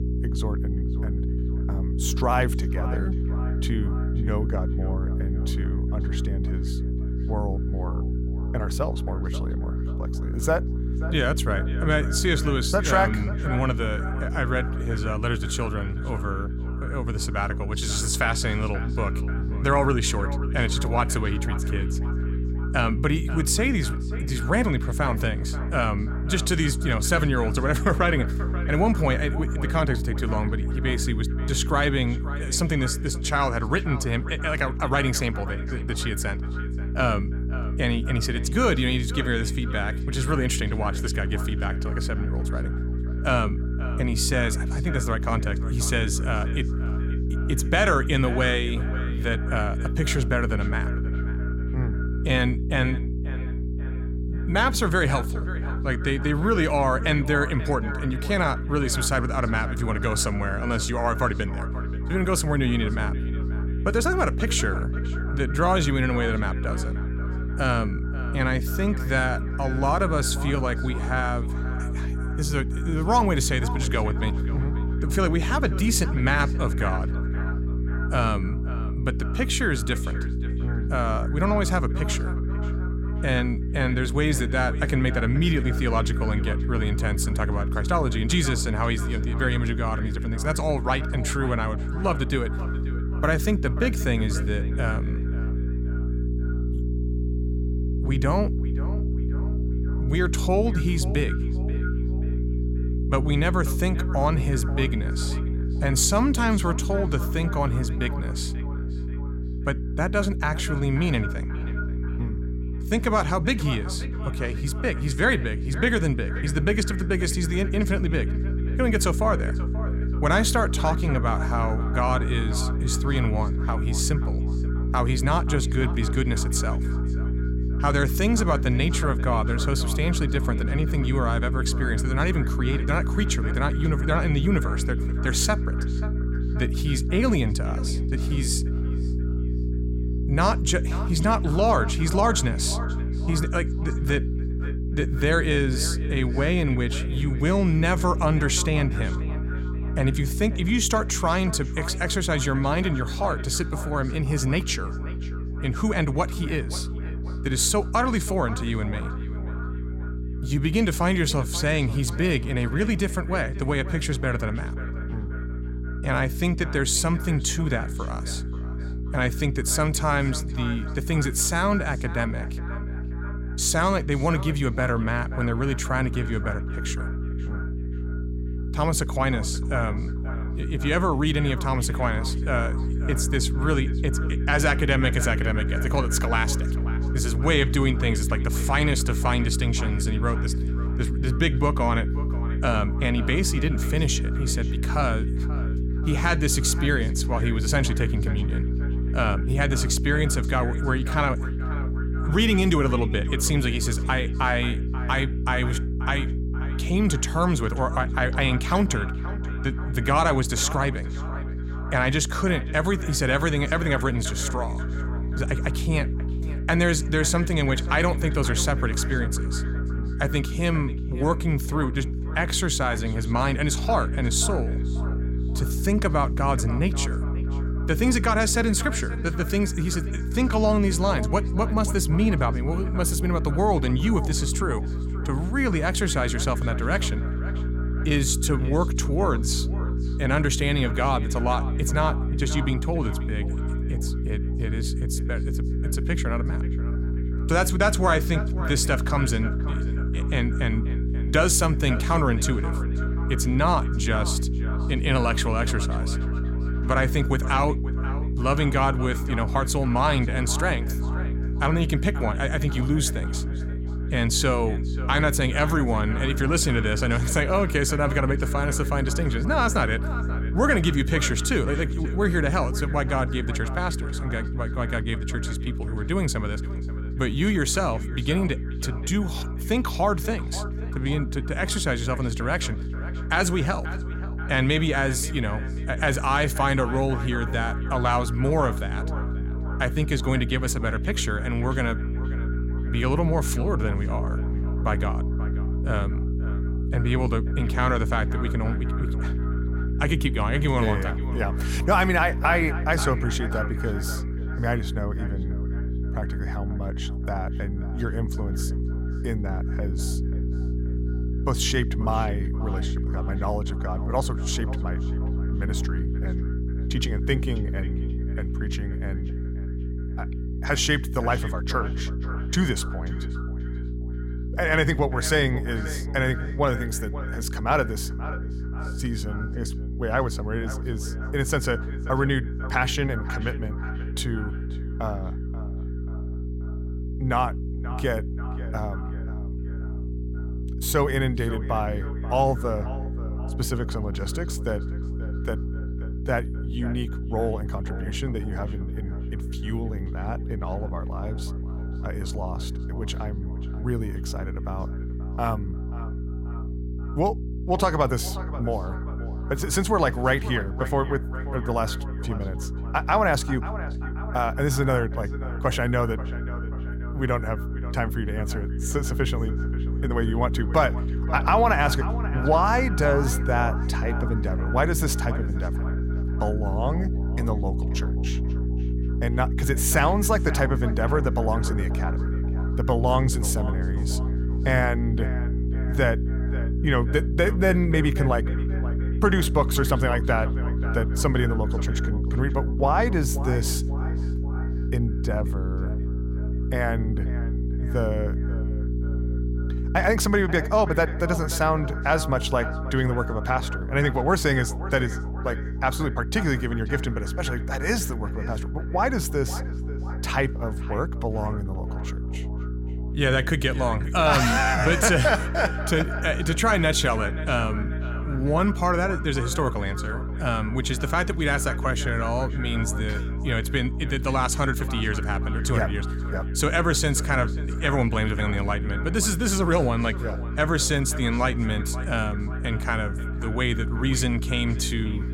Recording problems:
echo of what is said; noticeable; throughout; 530 ms later, 15 dB below the speech
electrical hum; noticeable; throughout; 60 Hz, 15 dB below the speech

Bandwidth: 16.5 kHz